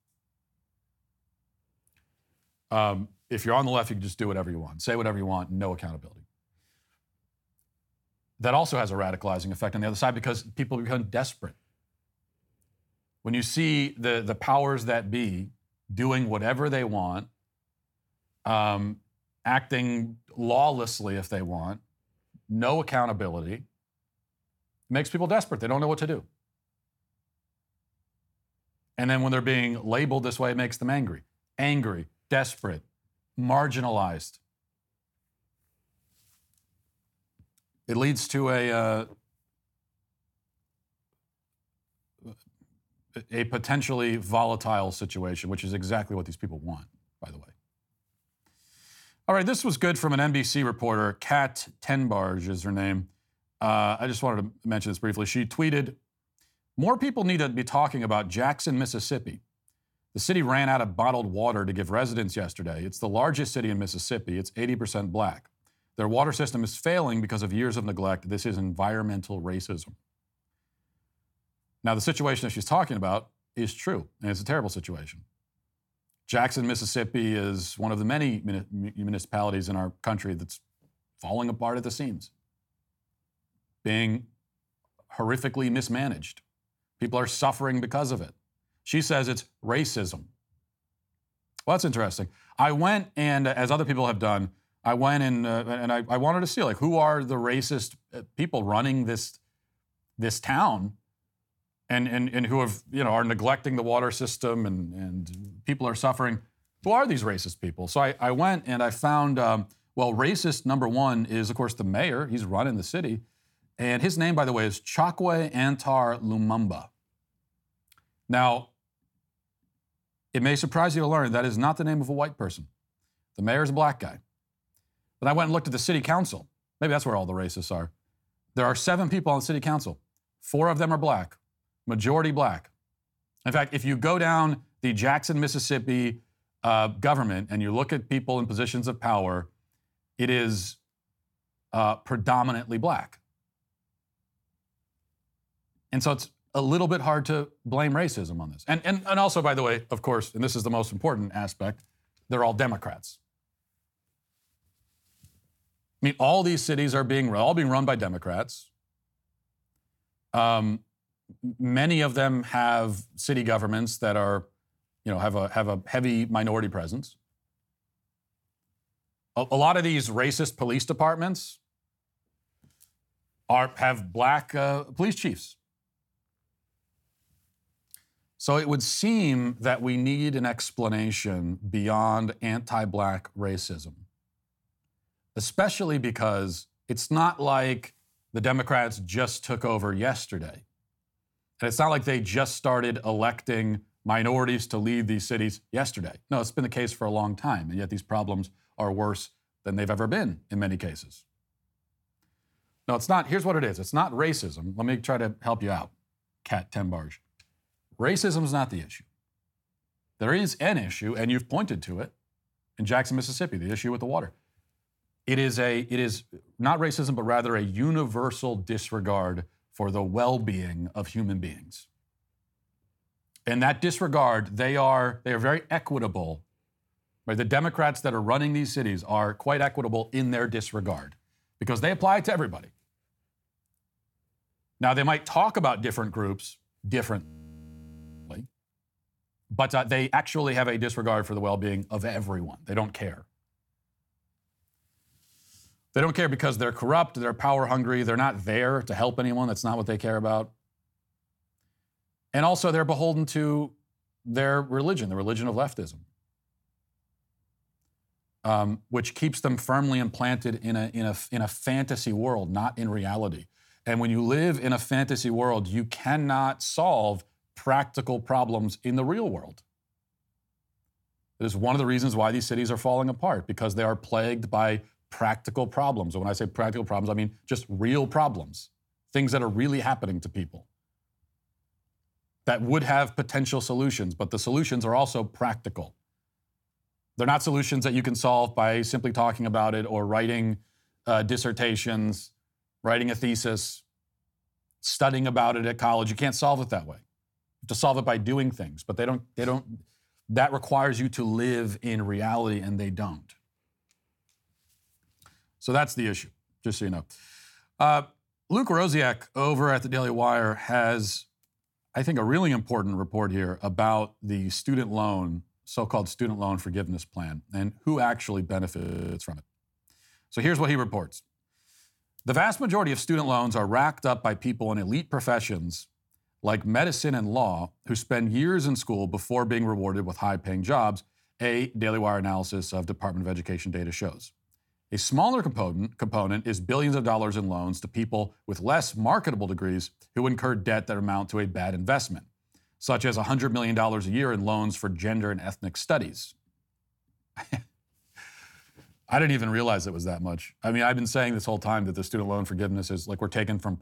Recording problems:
audio freezing; at 3:57 for 1 s and at 5:19

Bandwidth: 17.5 kHz